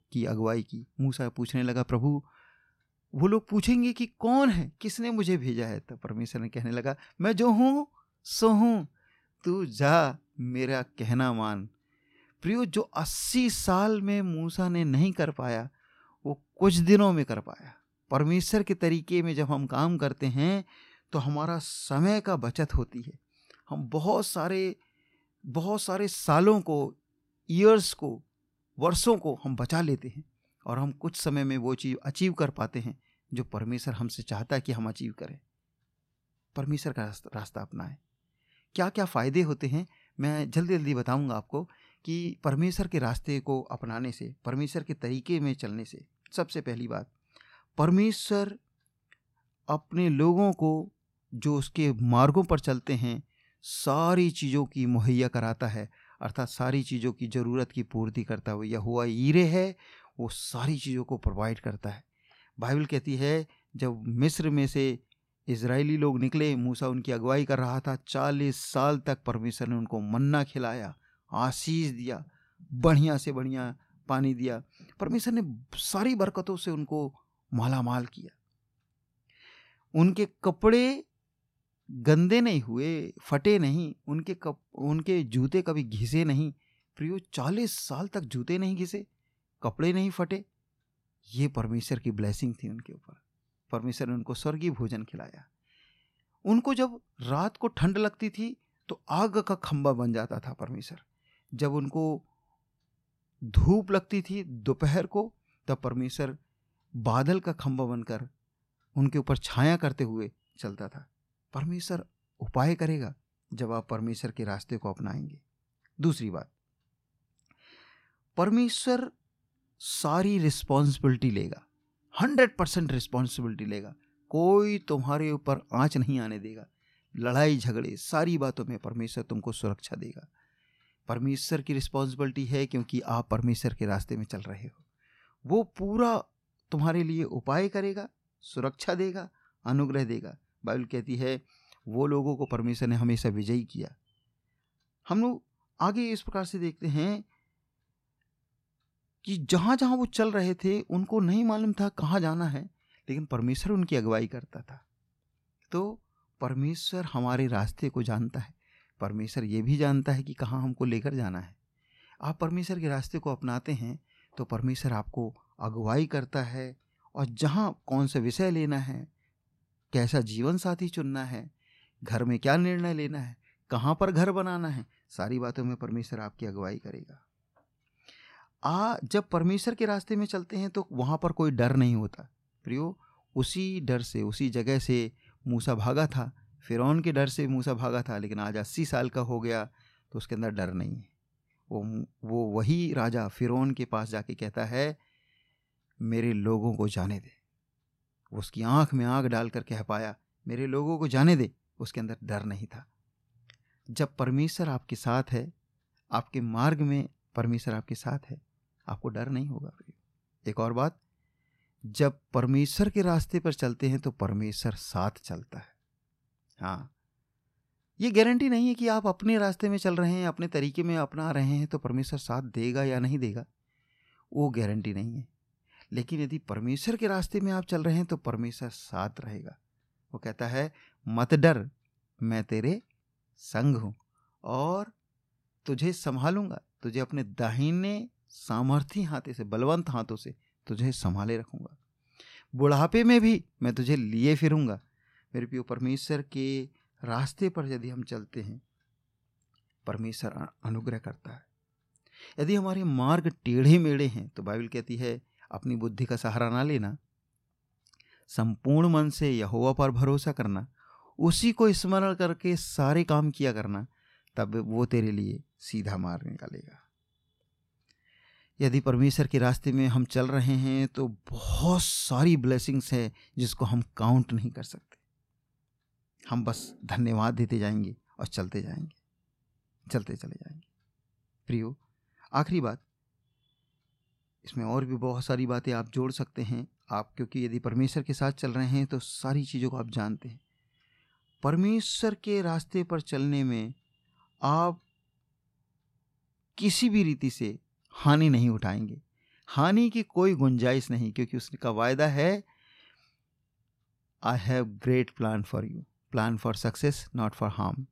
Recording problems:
none

